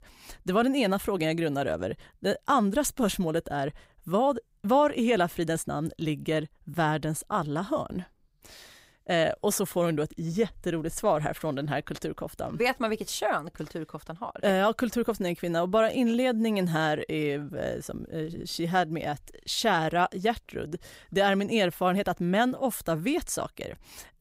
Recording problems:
none

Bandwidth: 15.5 kHz